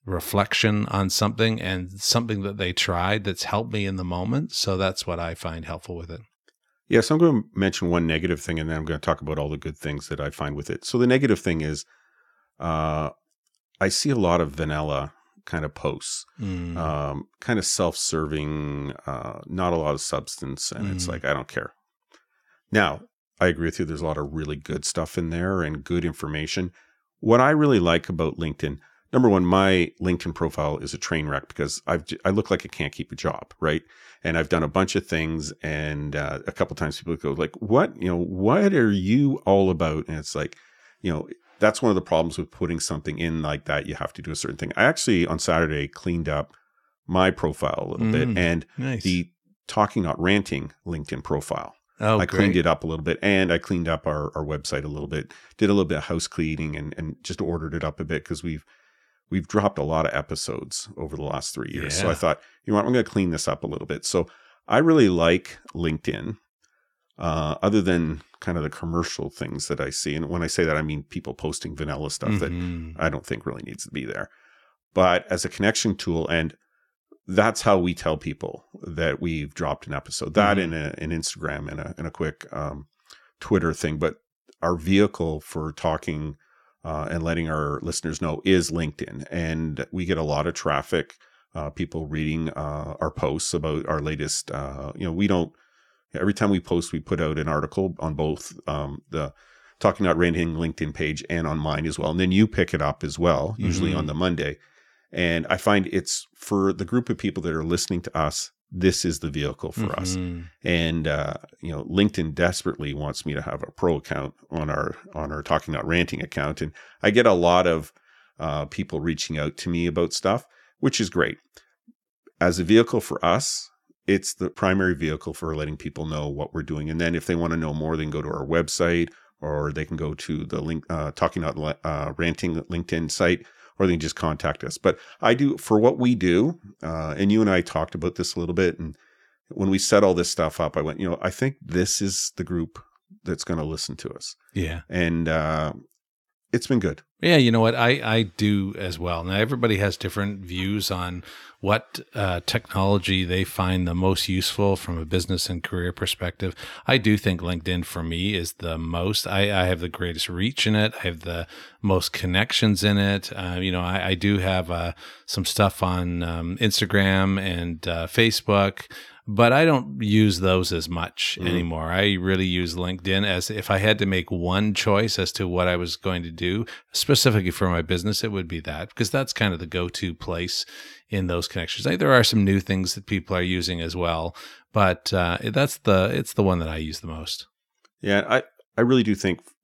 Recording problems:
none

